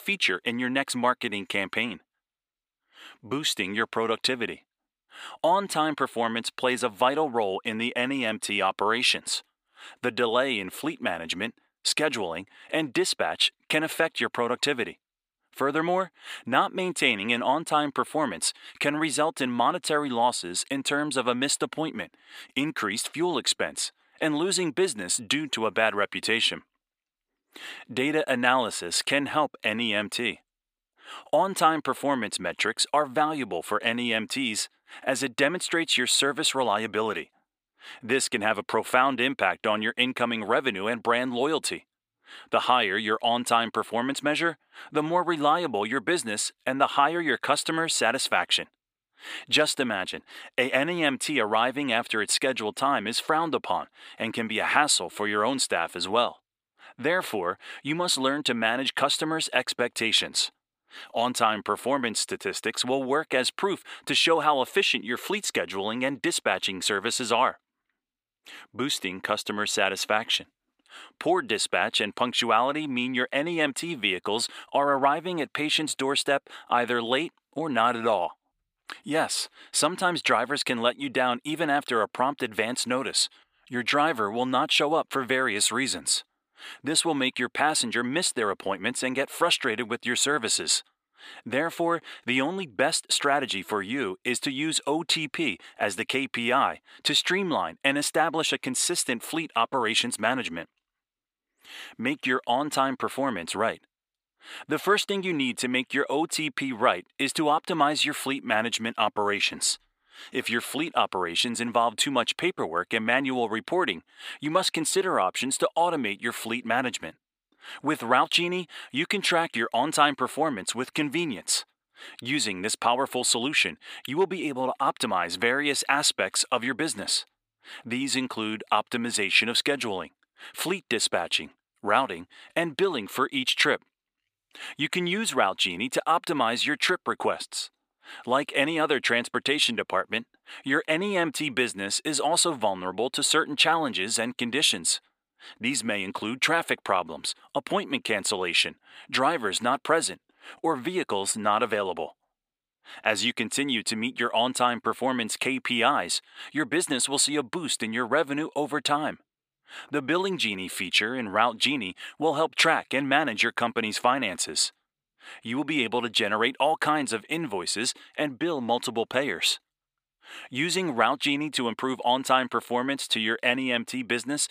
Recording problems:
thin; somewhat; fading below 350 Hz

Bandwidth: 15 kHz